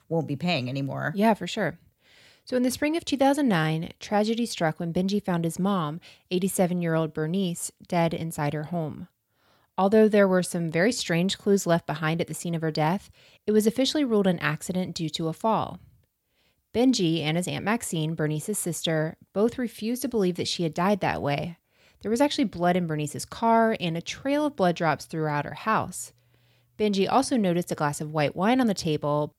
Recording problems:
none

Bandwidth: 16.5 kHz